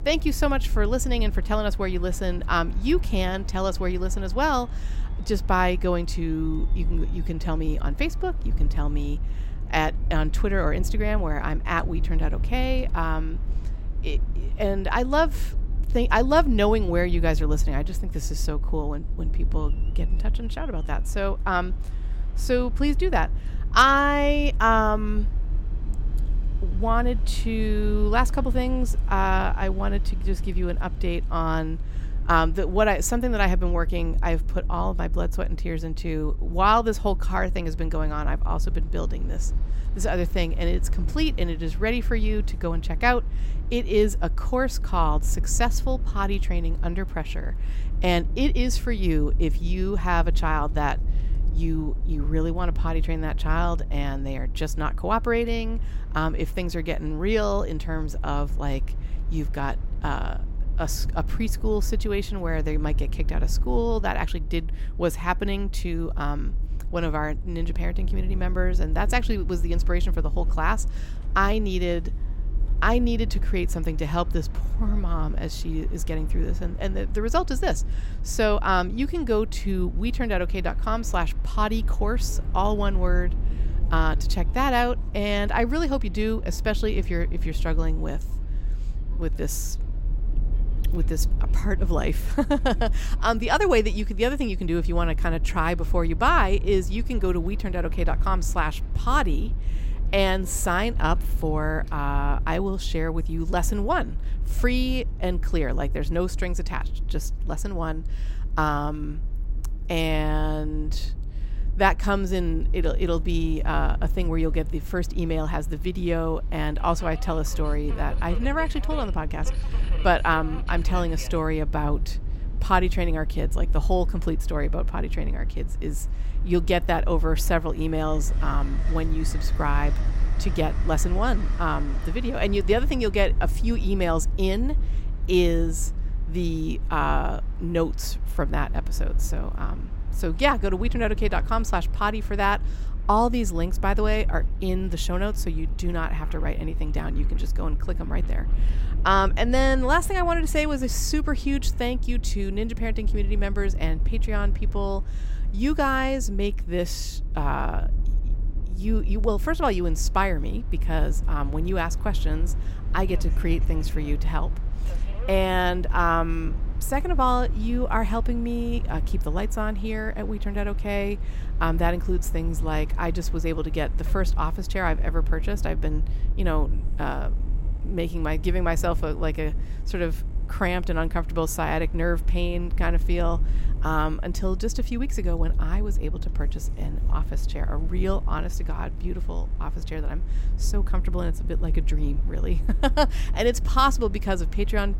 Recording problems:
train or aircraft noise; faint; throughout; 25 dB below the speech
low rumble; faint; throughout; 20 dB below the speech

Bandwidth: 16 kHz